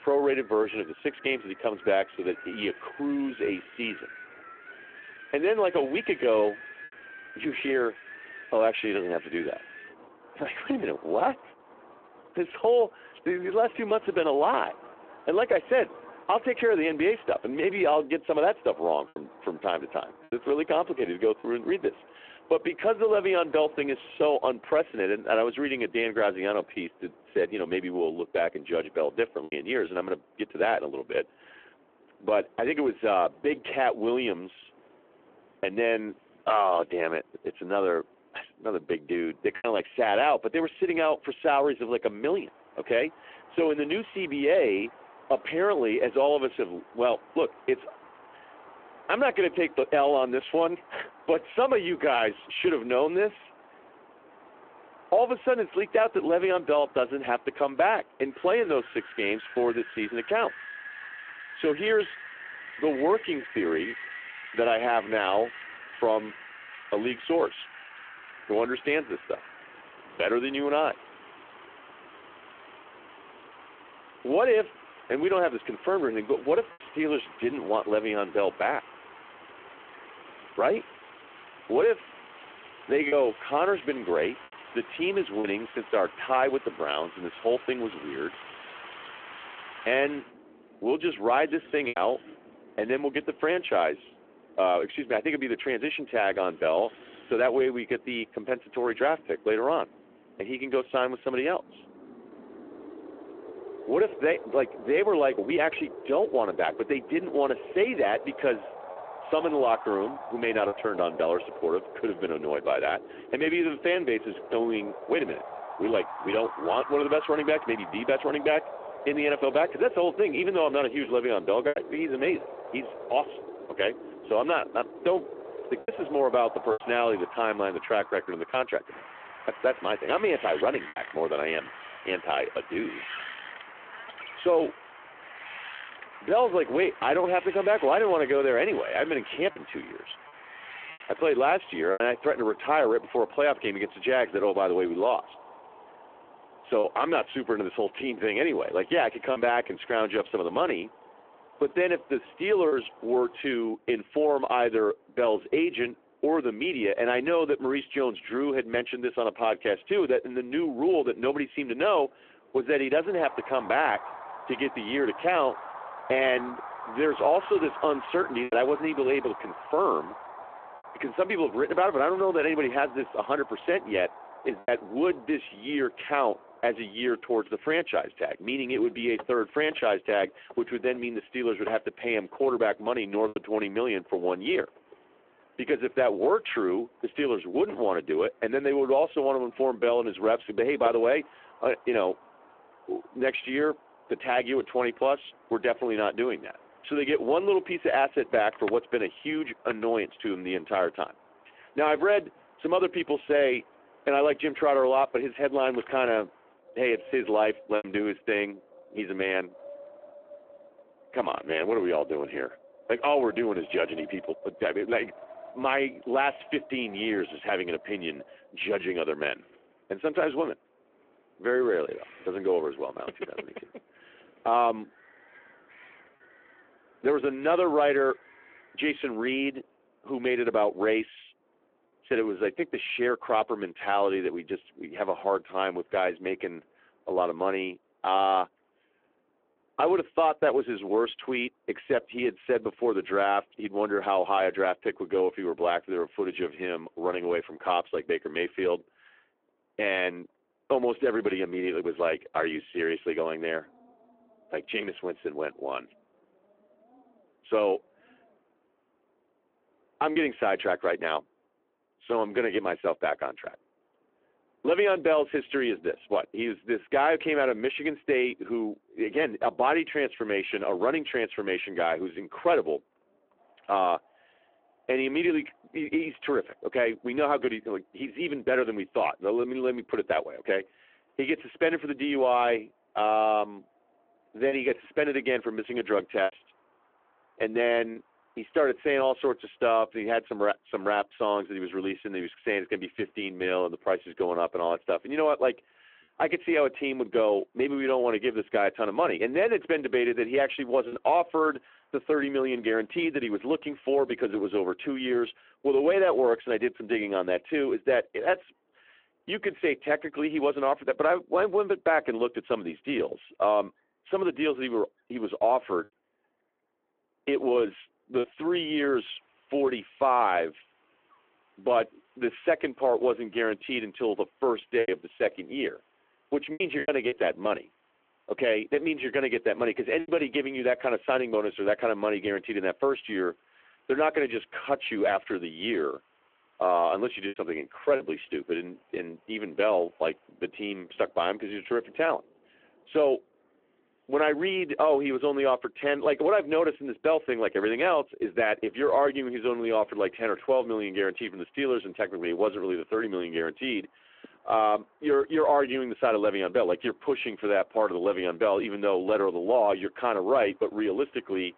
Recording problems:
phone-call audio
wind in the background; noticeable; throughout; 15 dB below the speech
choppy; occasionally; 1% of the speech affected

